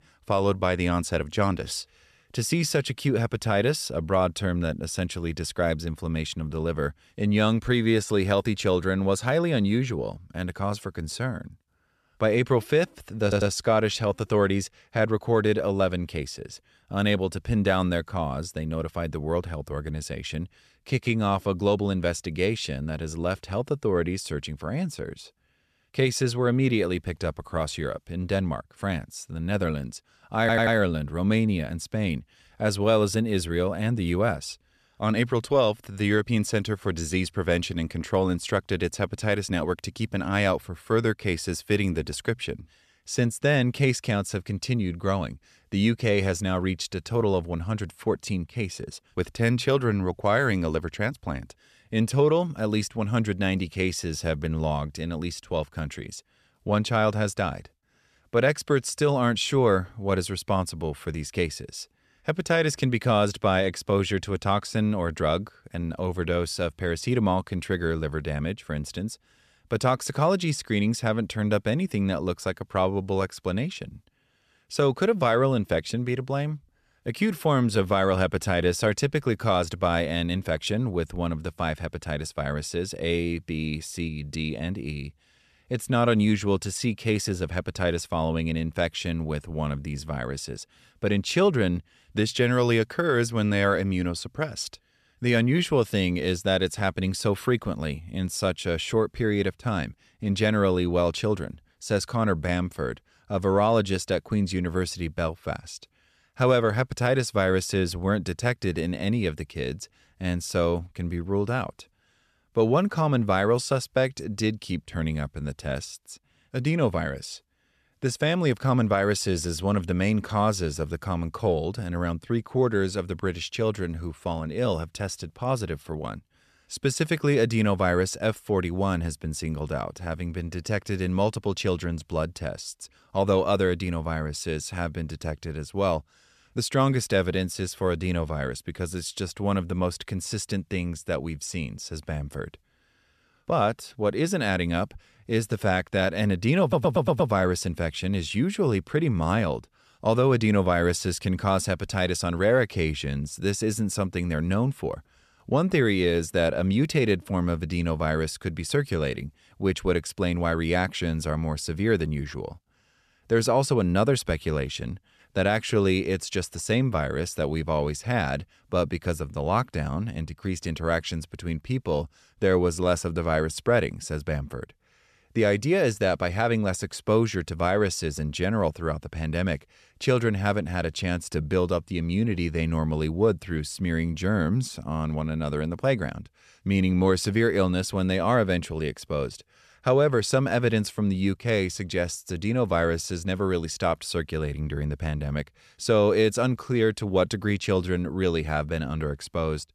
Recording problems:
audio stuttering; at 13 s, at 30 s and at 2:27

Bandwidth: 14 kHz